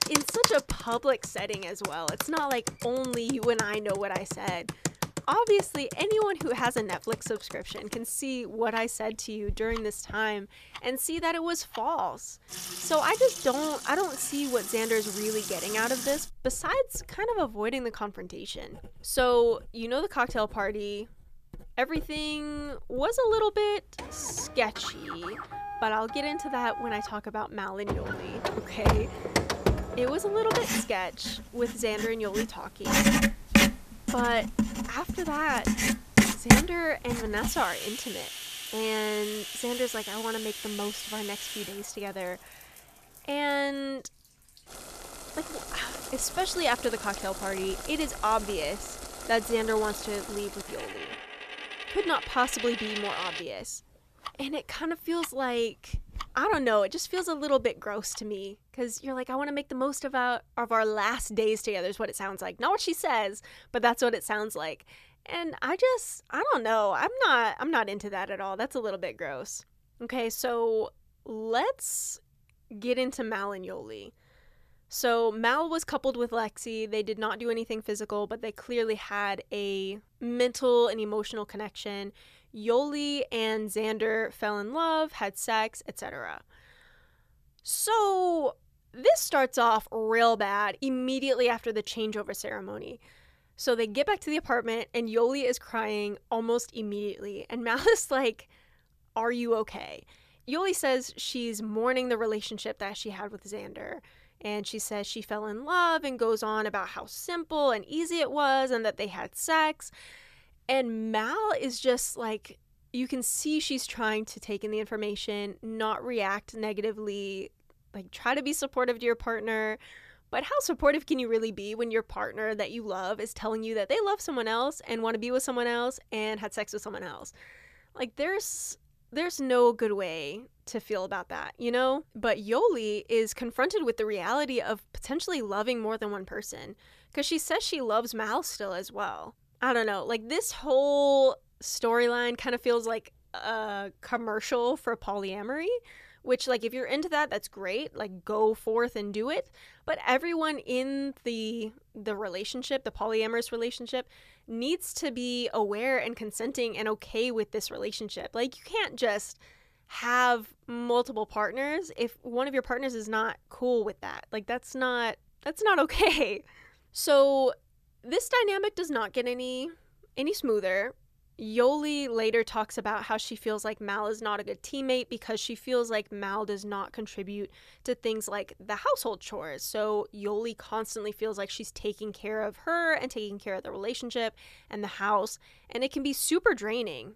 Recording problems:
household noises; loud; until 58 s; 3 dB below the speech

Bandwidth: 14.5 kHz